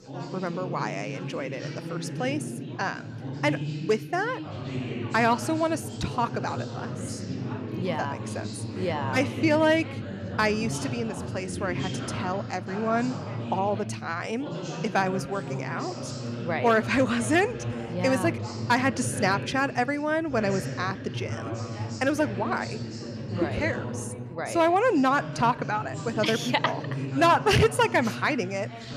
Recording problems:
background chatter; loud; throughout; 4 voices, 7 dB below the speech

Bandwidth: 14.5 kHz